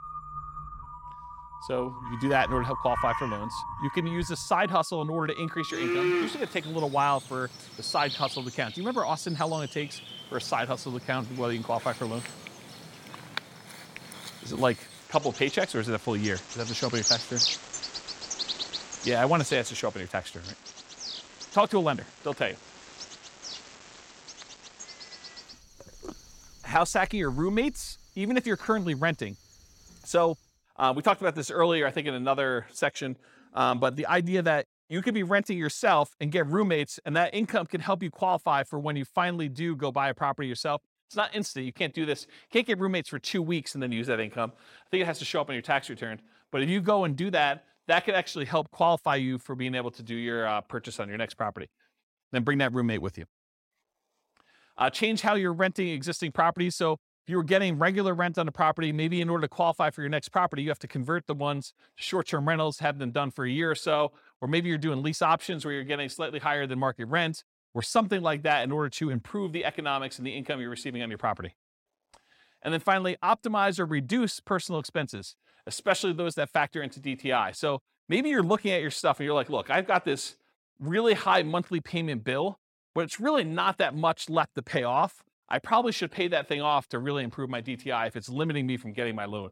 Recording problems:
animal sounds; loud; until 30 s; 7 dB below the speech

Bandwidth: 16.5 kHz